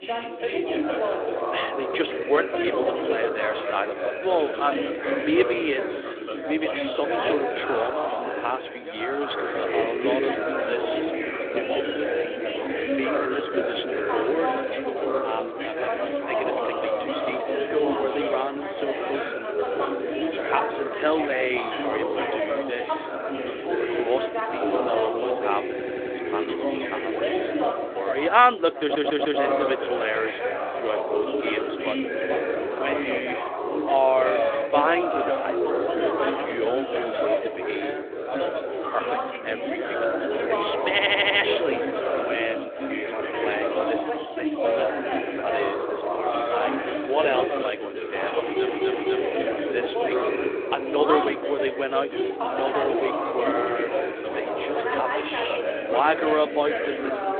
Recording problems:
phone-call audio; nothing above 3.5 kHz
chatter from many people; very loud; throughout; 1 dB above the speech
audio stuttering; 4 times, first at 26 s

